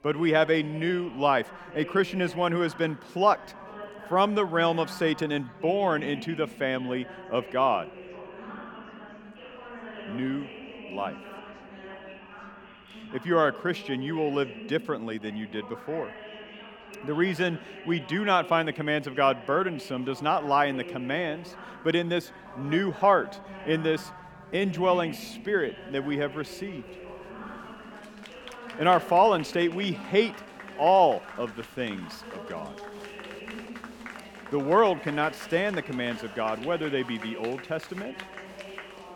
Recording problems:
chatter from many people; noticeable; throughout; 15 dB below the speech

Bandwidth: 18 kHz